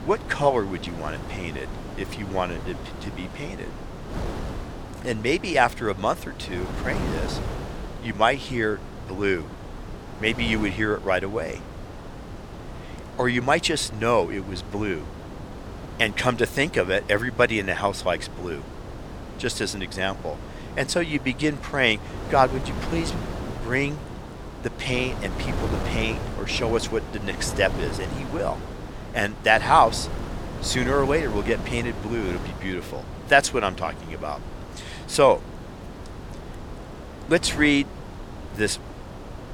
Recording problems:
wind noise on the microphone; occasional gusts; 15 dB below the speech

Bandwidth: 18.5 kHz